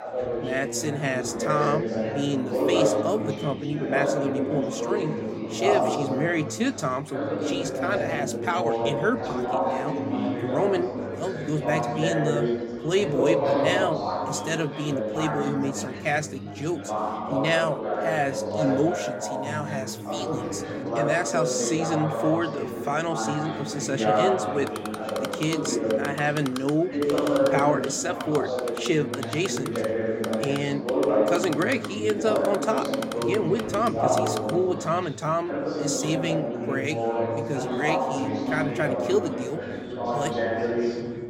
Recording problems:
chatter from many people; very loud; throughout; as loud as the speech
keyboard typing; noticeable; from 25 to 35 s; peak 7 dB below the speech

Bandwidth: 16 kHz